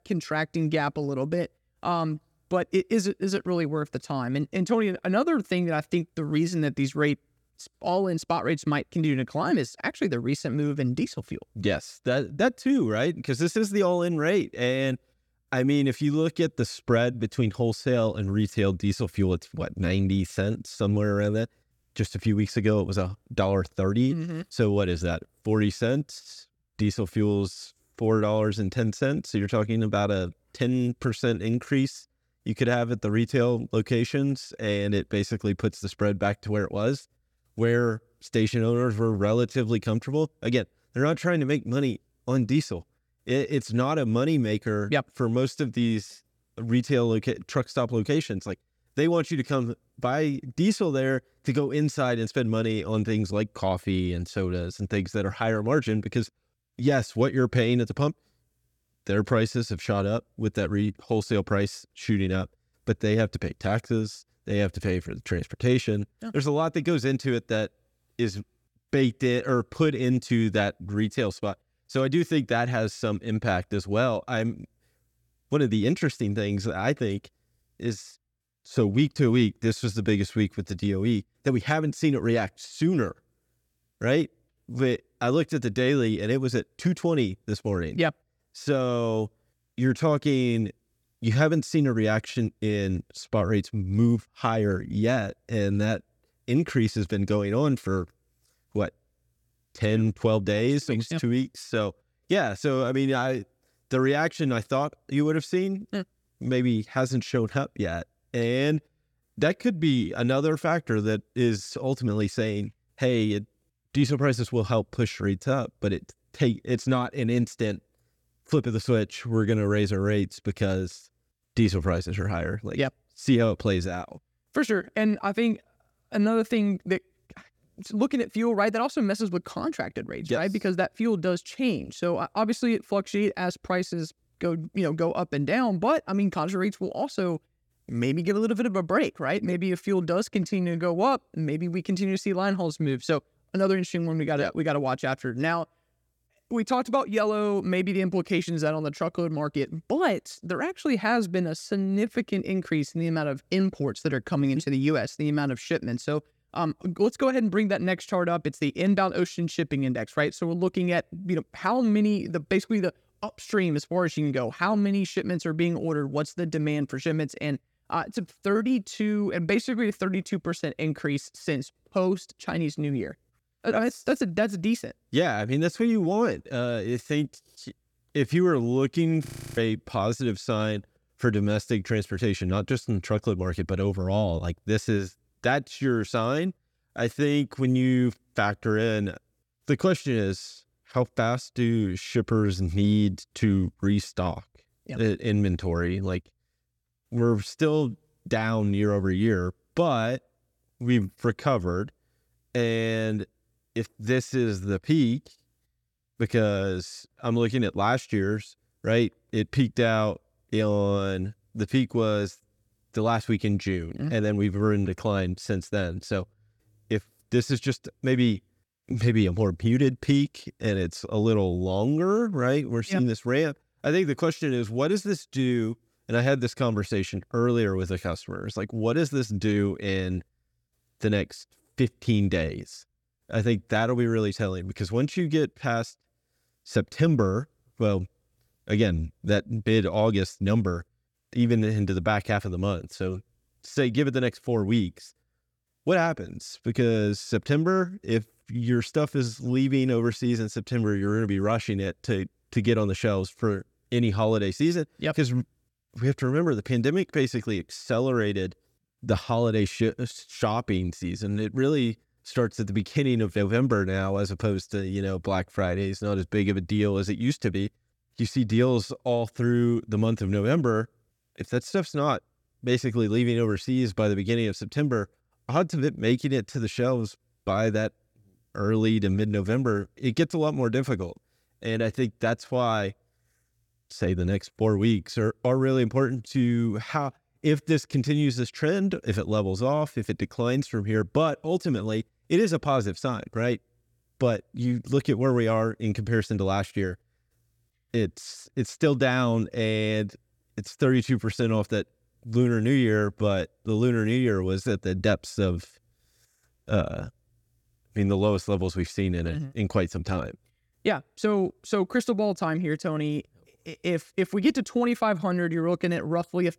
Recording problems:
audio freezing; at 2:59

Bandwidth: 17.5 kHz